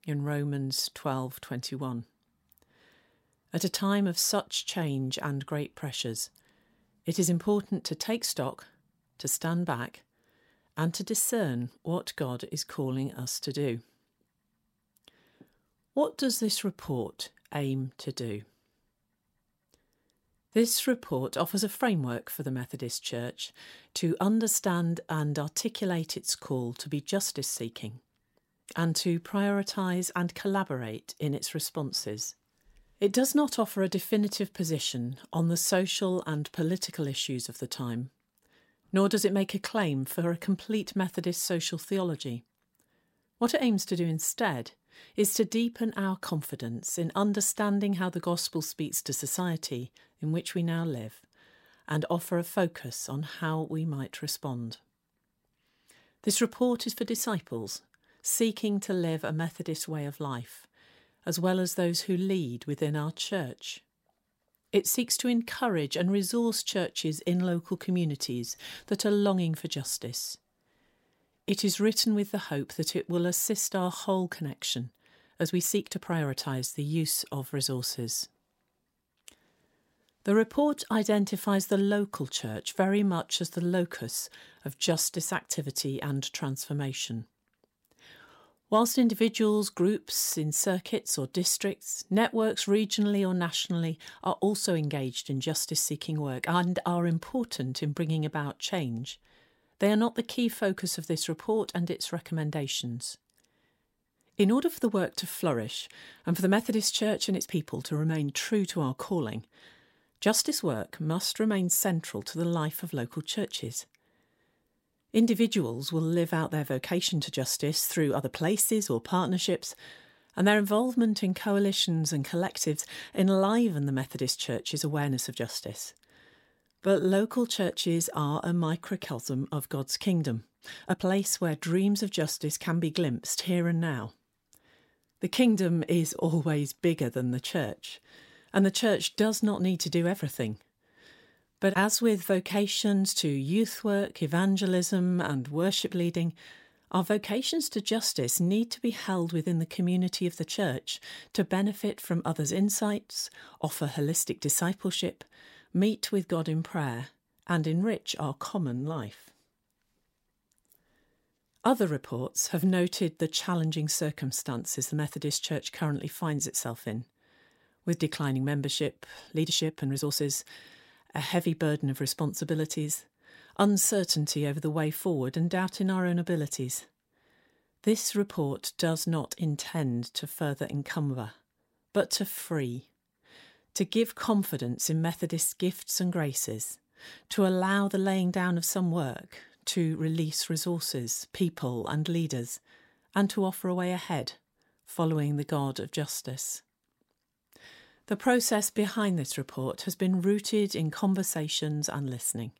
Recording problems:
uneven, jittery; strongly; from 16 s to 3:19

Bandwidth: 16 kHz